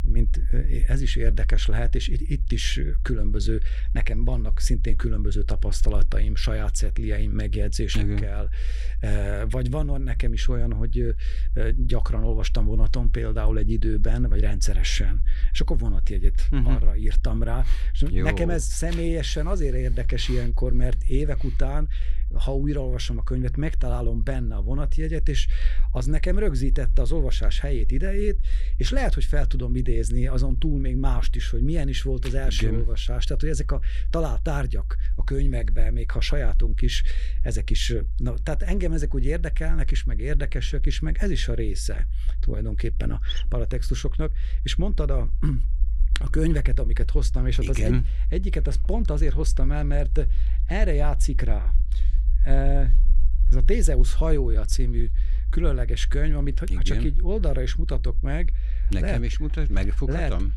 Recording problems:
low rumble; noticeable; throughout; 20 dB below the speech

